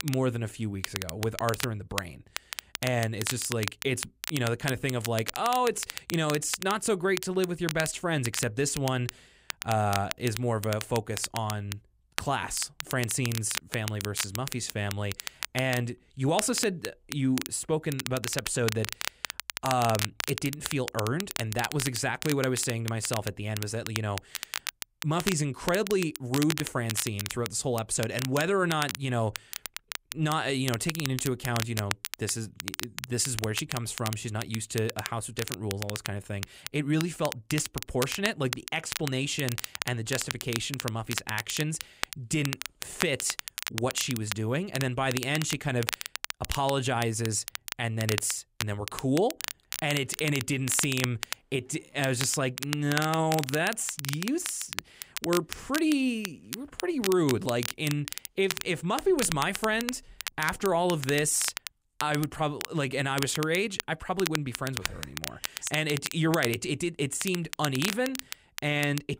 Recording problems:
crackle, like an old record; loud; 7 dB below the speech

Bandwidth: 15.5 kHz